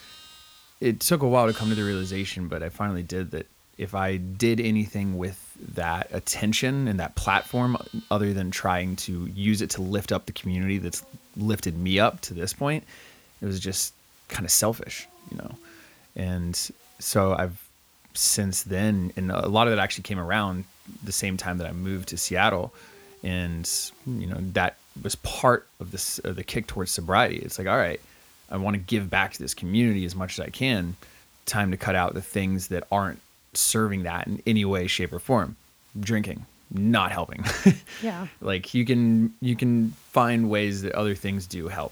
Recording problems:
animal sounds; faint; throughout; 20 dB below the speech
hiss; faint; throughout; 30 dB below the speech

